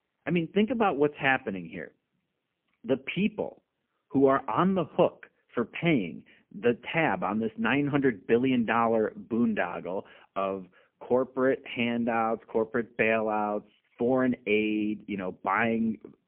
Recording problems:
phone-call audio; poor line; nothing above 3 kHz

